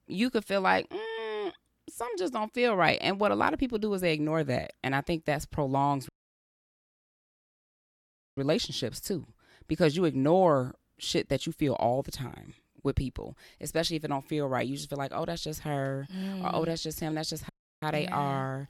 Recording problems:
audio cutting out; at 6 s for 2.5 s and at 17 s

